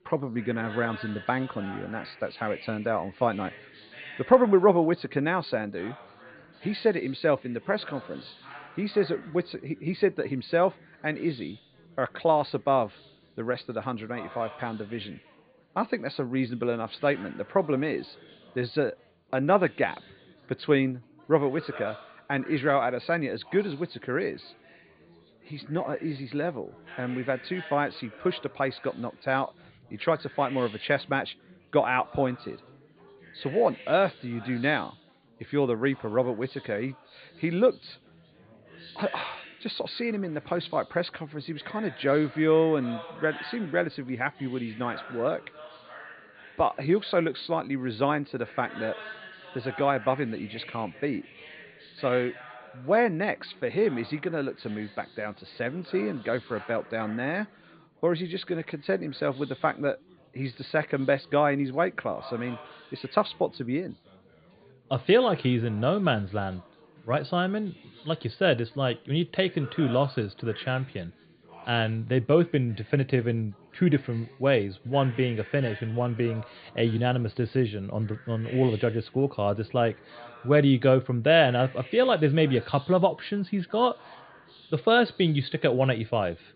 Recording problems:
high frequencies cut off; severe; nothing above 4.5 kHz
chatter from many people; noticeable; throughout; 20 dB below the speech

